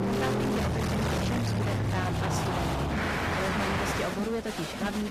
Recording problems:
distortion; heavy; 30% of the sound clipped
garbled, watery; slightly; nothing above 14.5 kHz
traffic noise; very loud; until 4 s; 4 dB above the speech
crowd noise; loud; throughout; 2 dB below the speech
abrupt cut into speech; at the end

